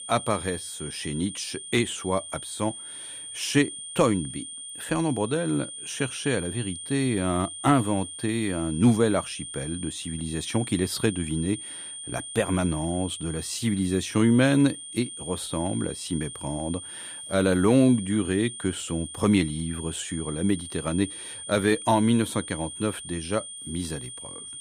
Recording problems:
high-pitched whine; loud; throughout; 9 kHz, 10 dB below the speech

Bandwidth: 15 kHz